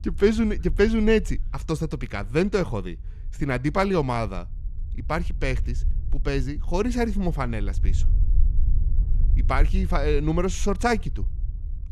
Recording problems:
low rumble; faint; throughout; 25 dB below the speech

